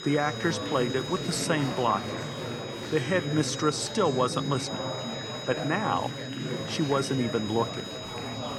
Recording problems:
chatter from many people; loud; throughout; 6 dB below the speech
high-pitched whine; noticeable; throughout; 4 kHz, 10 dB below the speech

